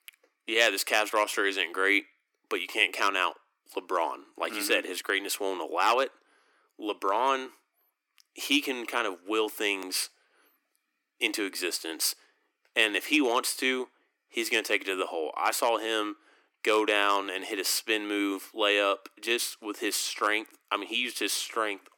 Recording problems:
thin; very; fading below 300 Hz

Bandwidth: 18 kHz